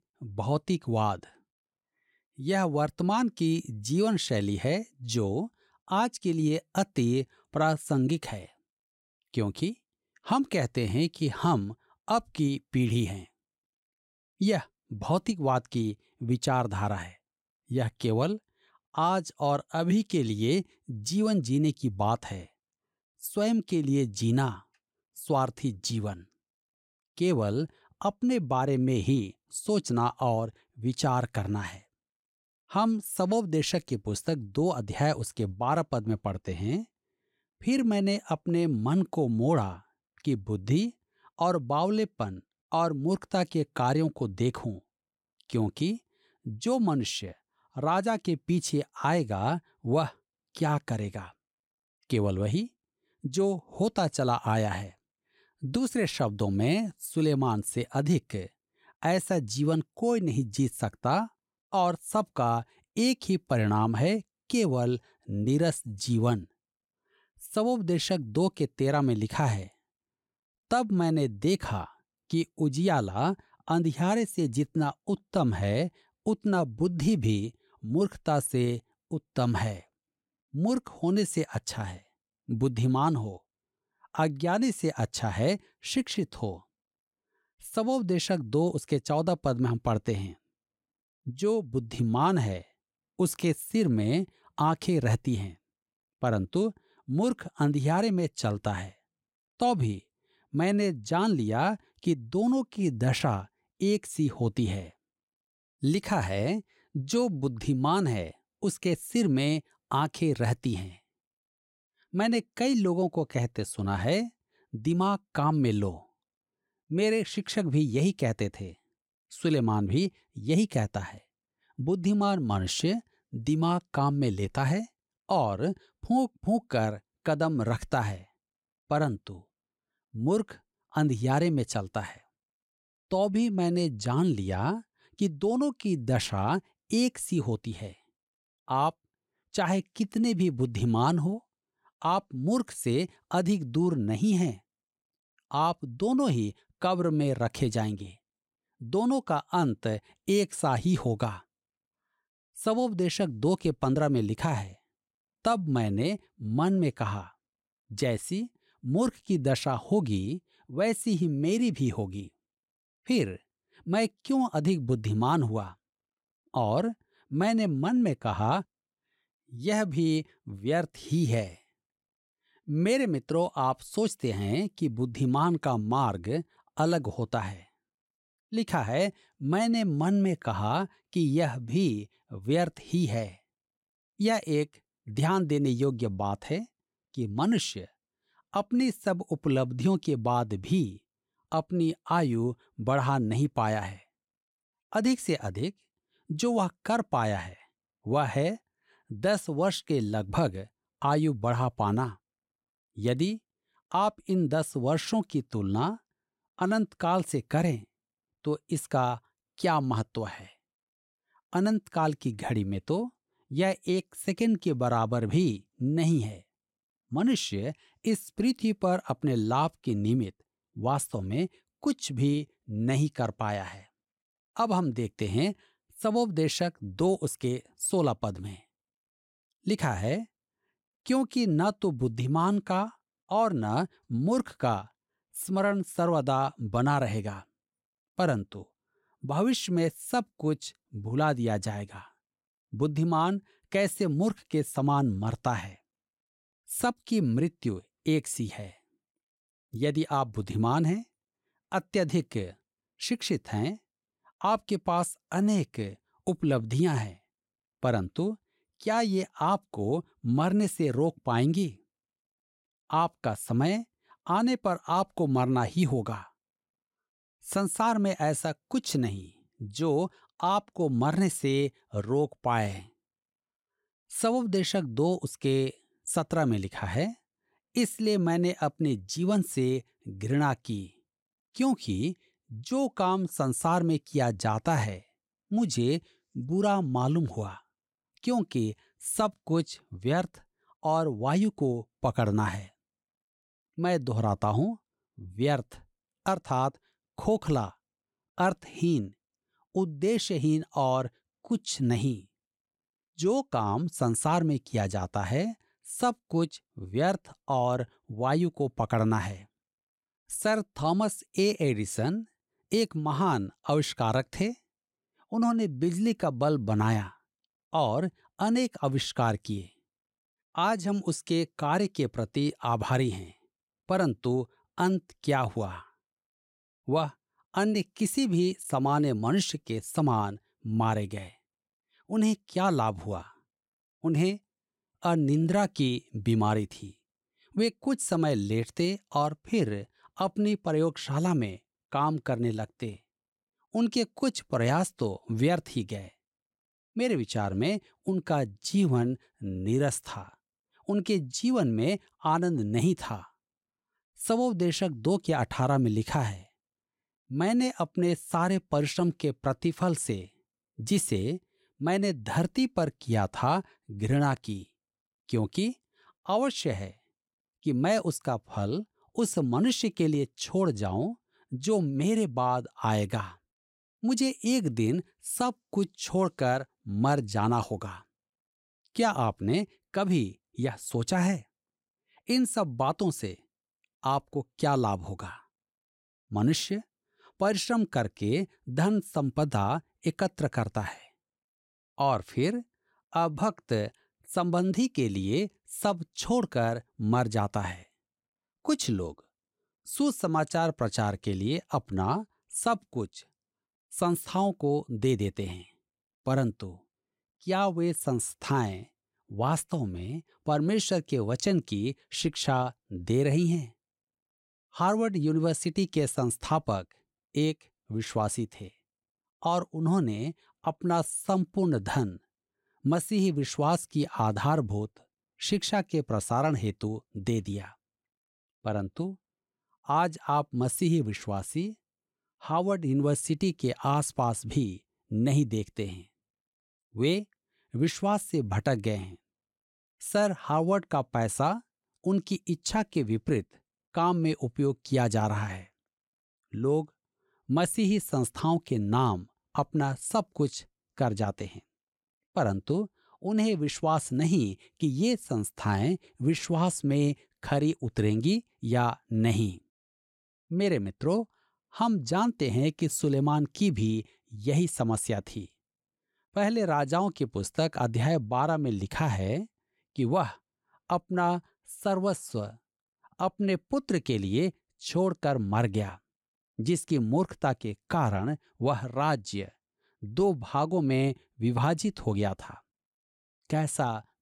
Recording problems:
none

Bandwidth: 16 kHz